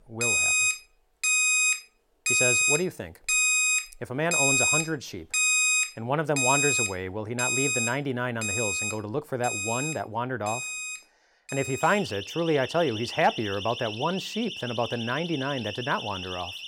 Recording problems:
alarms or sirens; very loud; throughout; 4 dB above the speech

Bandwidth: 16.5 kHz